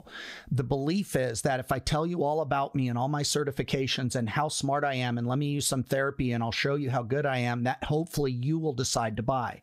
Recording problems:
squashed, flat; somewhat

